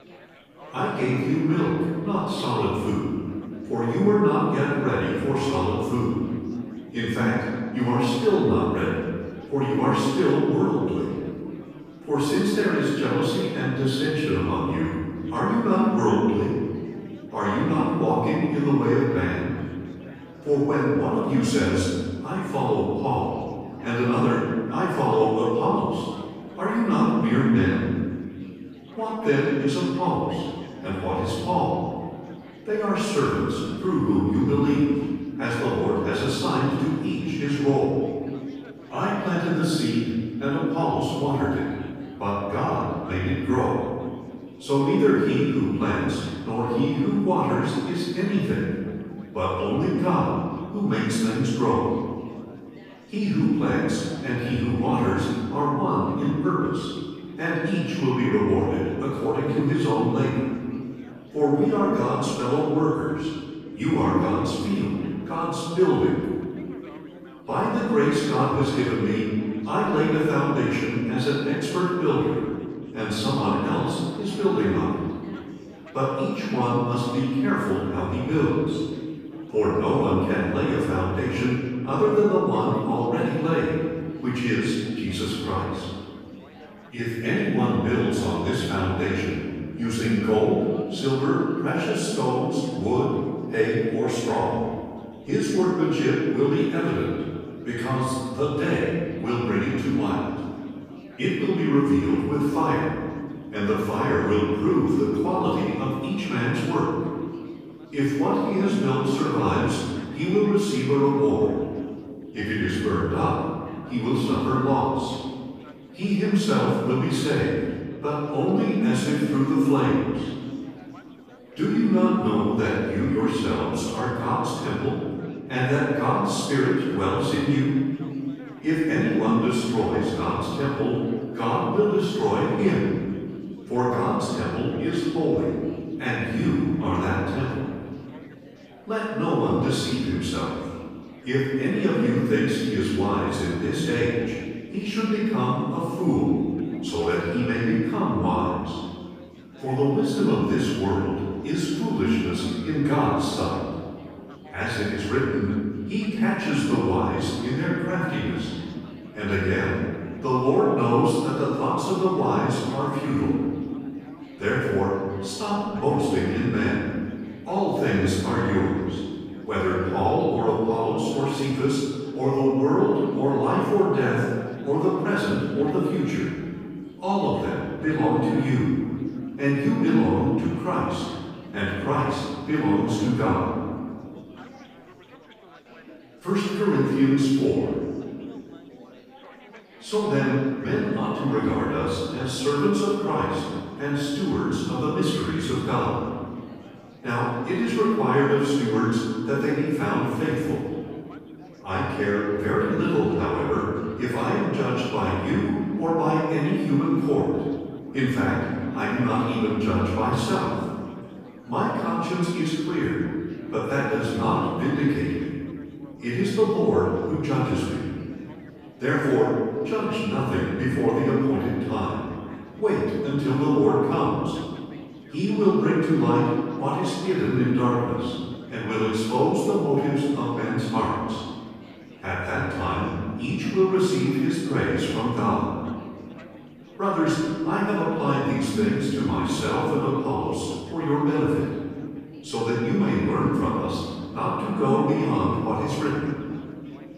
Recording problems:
room echo; strong; dies away in 1.7 s
off-mic speech; far
chatter from many people; faint; throughout; 25 dB below the speech

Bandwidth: 15 kHz